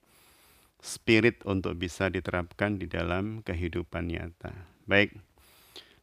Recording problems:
none

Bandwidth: 15 kHz